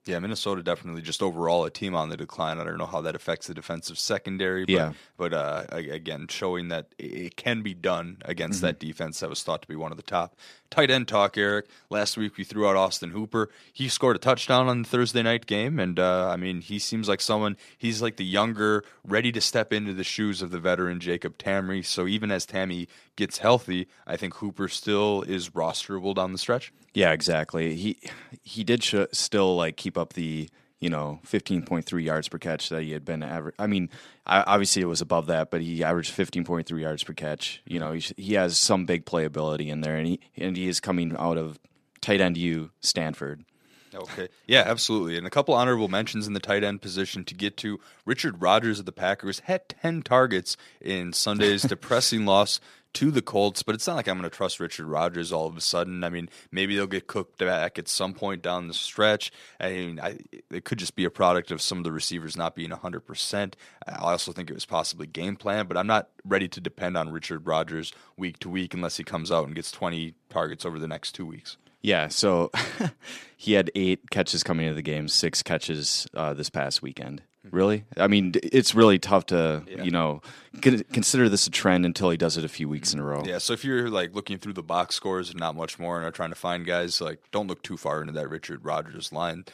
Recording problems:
none

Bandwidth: 14 kHz